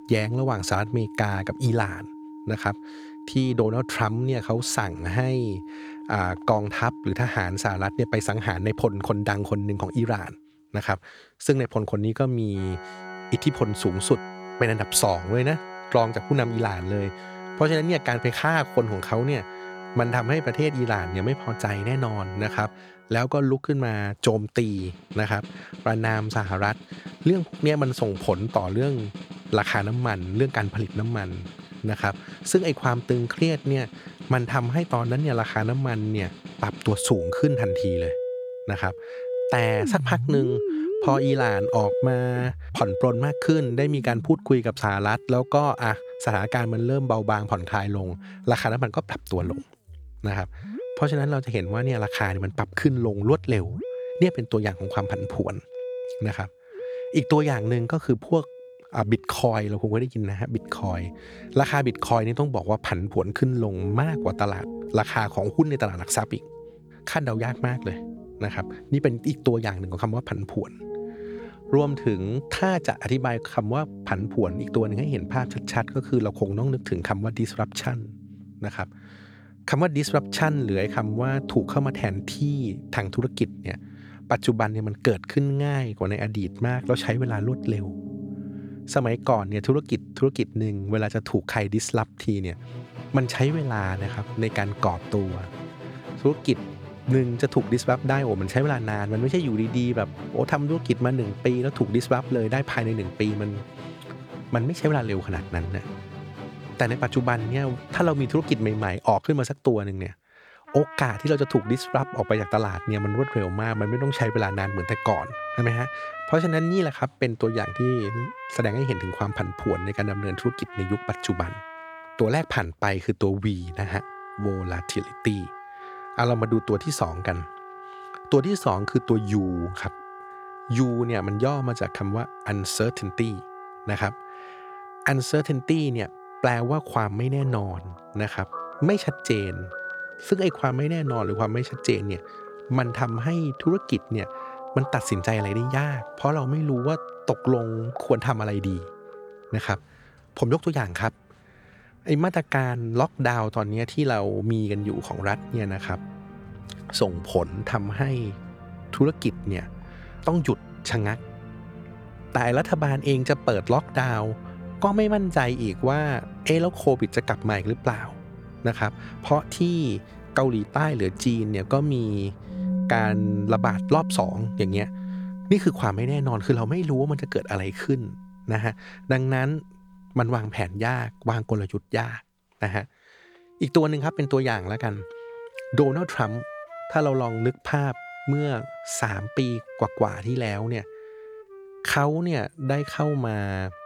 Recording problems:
background music; noticeable; throughout; 10 dB below the speech

